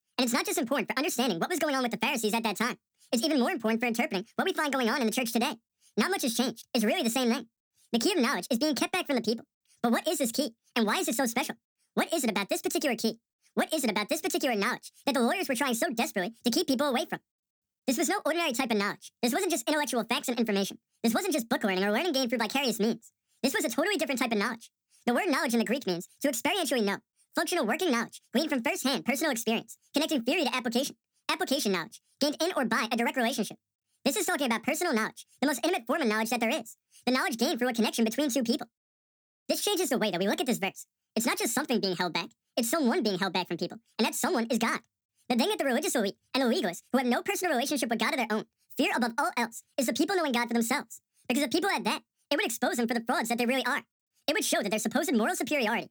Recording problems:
wrong speed and pitch; too fast and too high; 1.7 times normal speed

